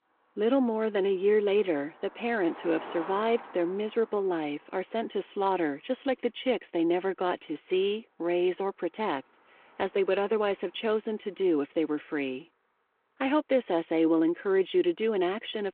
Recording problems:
phone-call audio
traffic noise; noticeable; throughout; 20 dB below the speech

